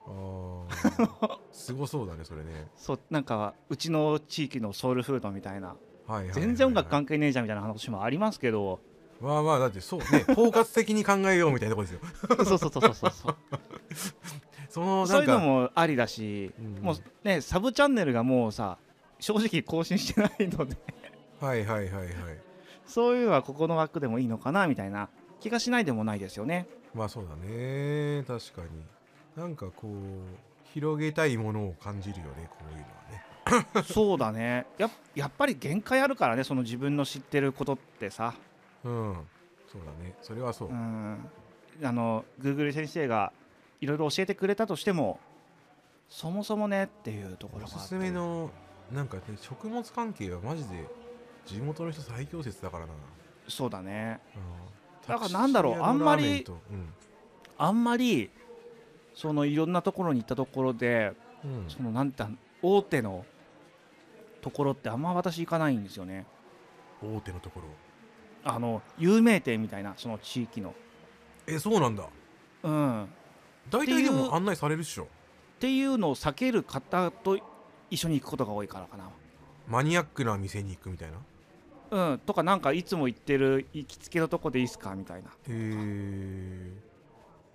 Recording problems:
murmuring crowd; faint; throughout; 25 dB below the speech

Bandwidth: 14.5 kHz